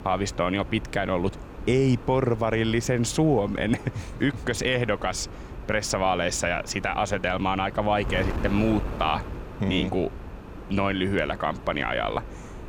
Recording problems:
wind noise on the microphone; occasional gusts; 15 dB below the speech

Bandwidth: 17.5 kHz